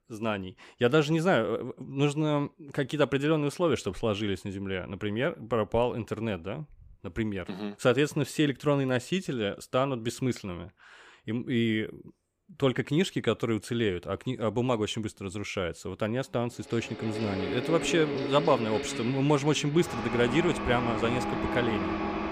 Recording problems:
machinery noise; loud; from 17 s on; 5 dB below the speech

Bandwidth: 15 kHz